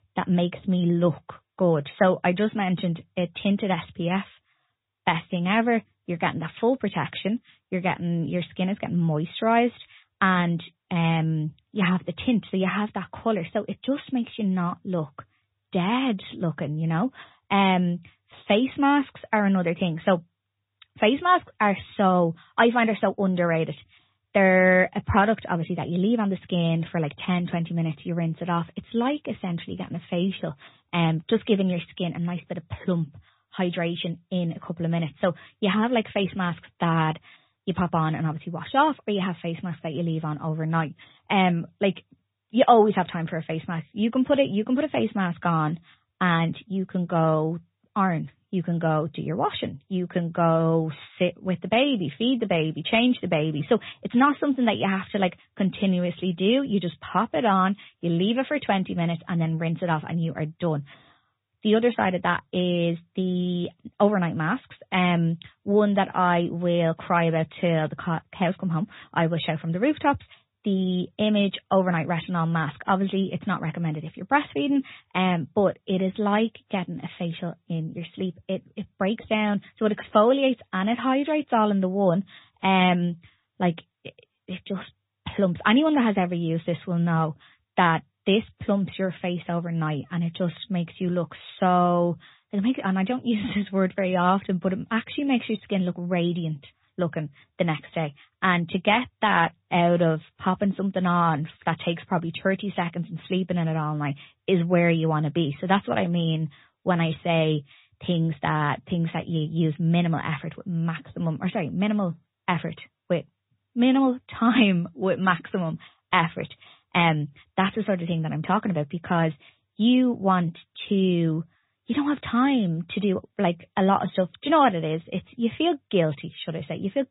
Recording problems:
high frequencies cut off; severe; nothing above 4 kHz
garbled, watery; slightly

